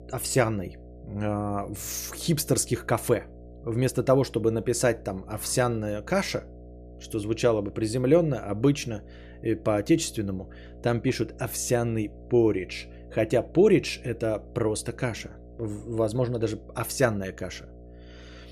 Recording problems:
electrical hum; faint; throughout; 60 Hz, 25 dB below the speech

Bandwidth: 14.5 kHz